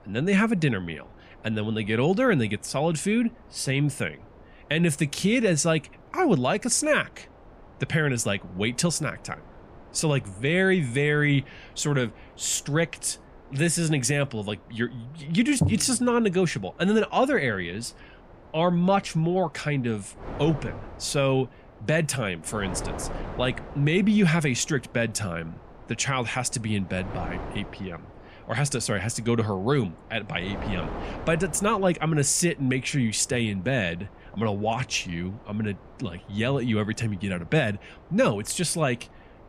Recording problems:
wind noise on the microphone; occasional gusts; 20 dB below the speech

